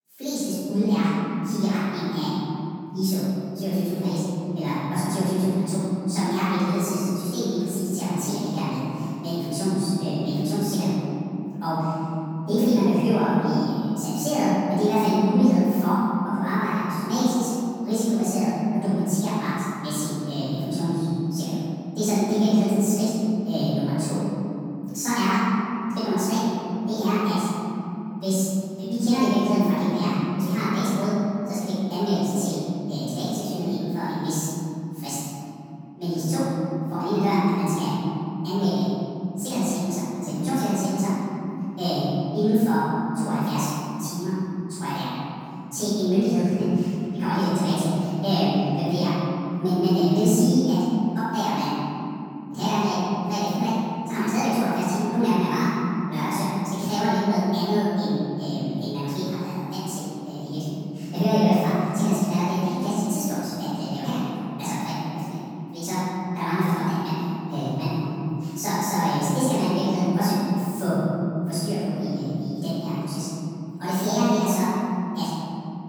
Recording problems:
room echo; strong; dies away in 3 s
off-mic speech; far
wrong speed and pitch; too fast and too high; 1.5 times normal speed

